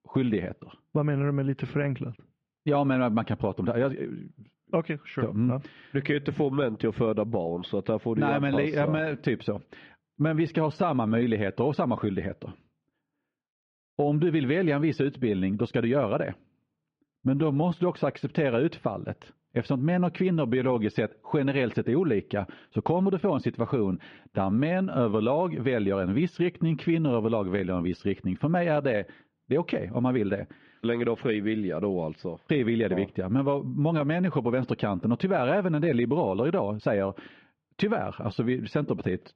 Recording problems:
muffled; very; fading above 3 kHz
uneven, jittery; strongly; from 8.5 to 37 s

